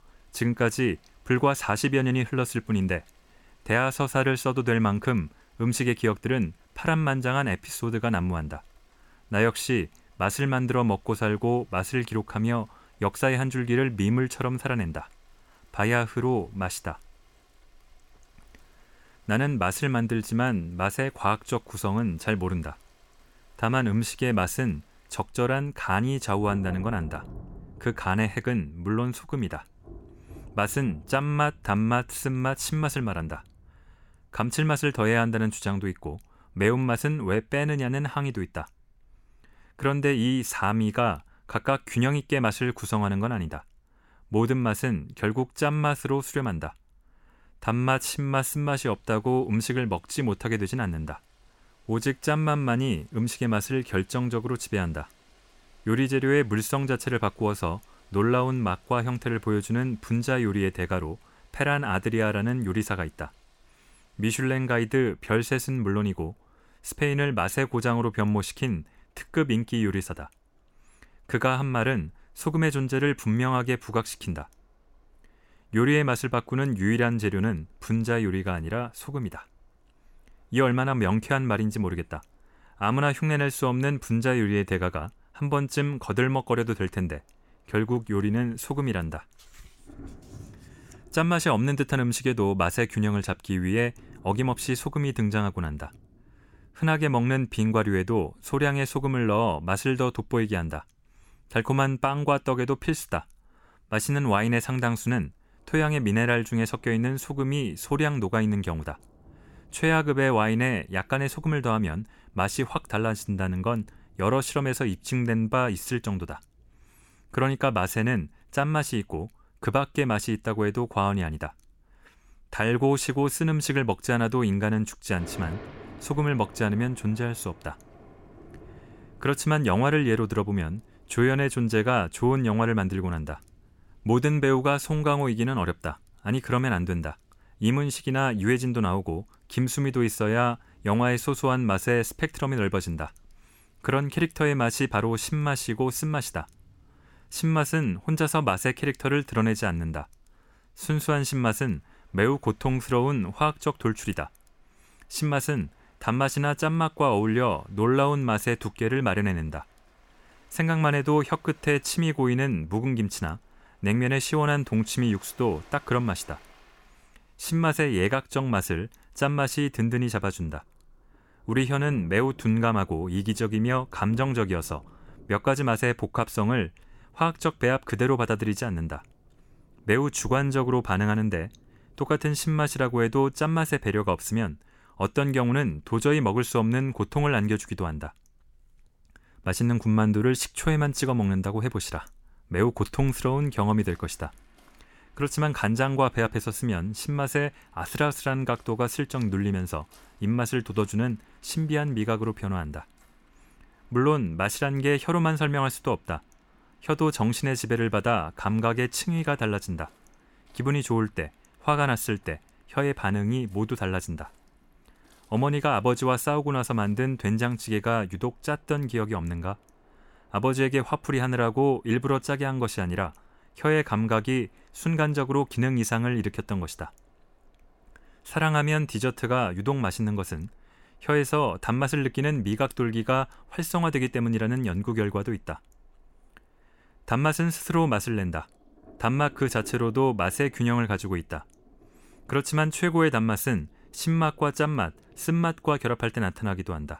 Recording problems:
rain or running water; faint; throughout; 30 dB below the speech

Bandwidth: 17.5 kHz